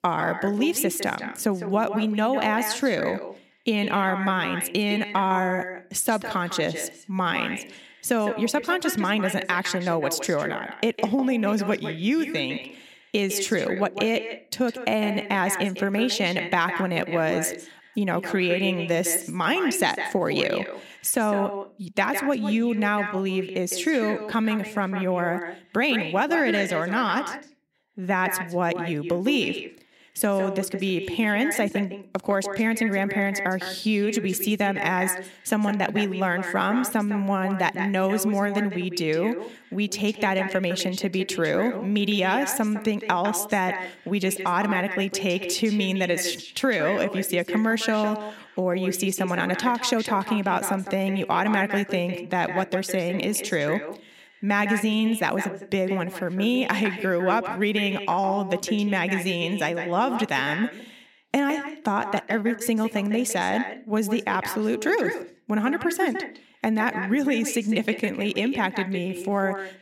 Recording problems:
echo of what is said; strong; throughout; 160 ms later, 9 dB below the speech

